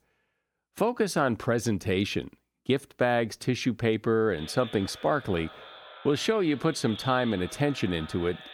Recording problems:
echo of what is said; noticeable; from 4.5 s on; 230 ms later, 15 dB below the speech

